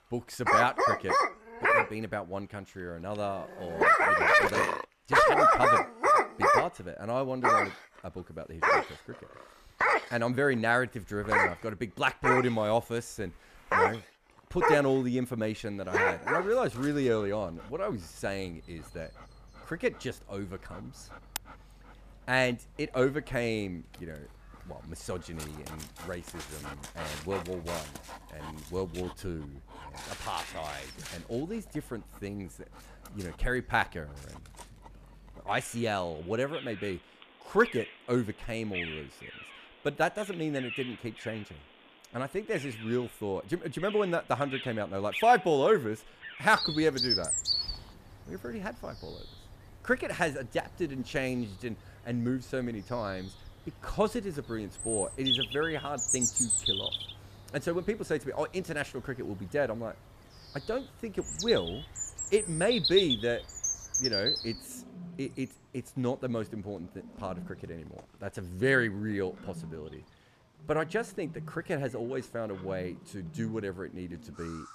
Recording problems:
animal sounds; very loud; throughout; 4 dB above the speech

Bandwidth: 14.5 kHz